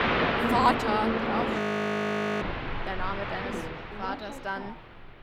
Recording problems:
train or aircraft noise; very loud; throughout; 2 dB above the speech
audio freezing; at 1.5 s for 1 s

